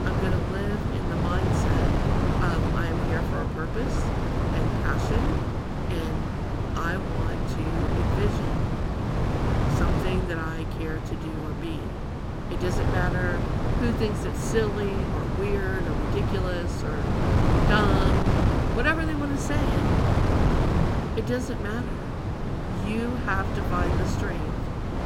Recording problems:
wind noise on the microphone; heavy; 1 dB above the speech

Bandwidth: 16.5 kHz